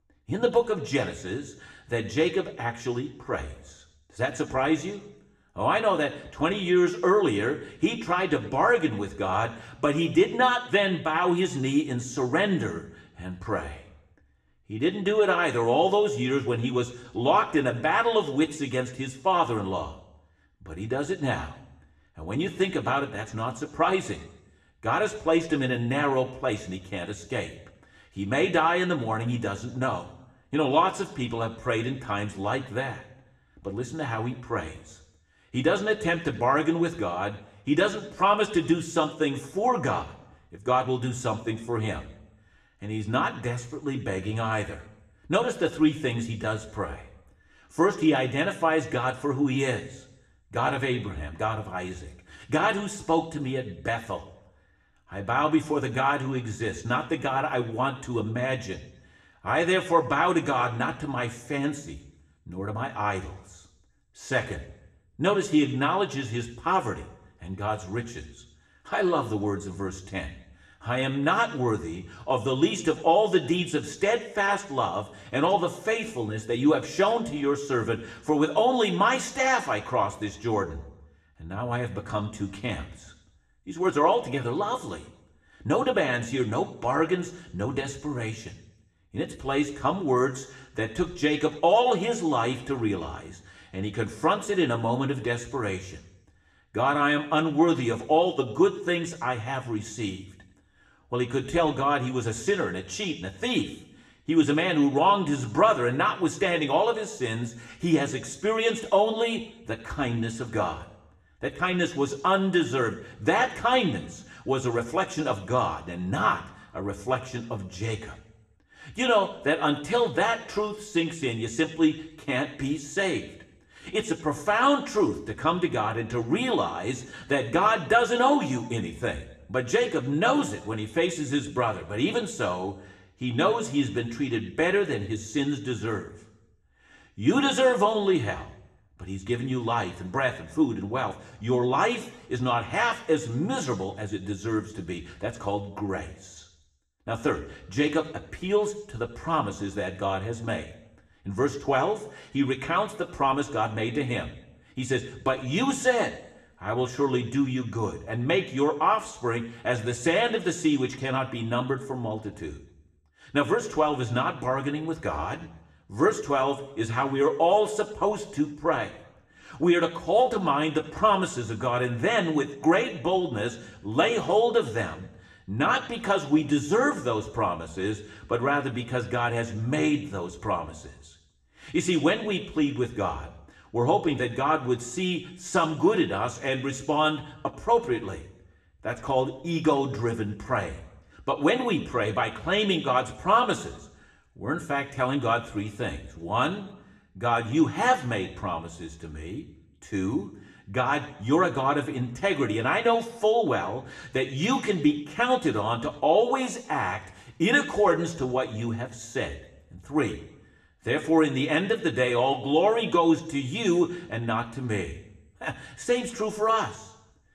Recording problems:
room echo; very slight; dies away in 0.7 s
off-mic speech; somewhat distant

